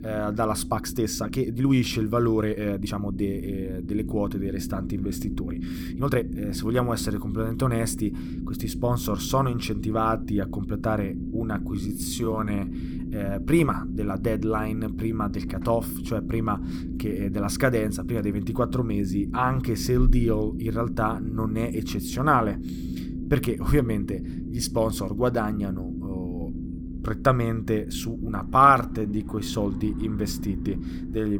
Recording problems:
low rumble; noticeable; throughout; 10 dB below the speech
uneven, jittery; strongly; from 0.5 to 29 s
abrupt cut into speech; at the end

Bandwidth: 18.5 kHz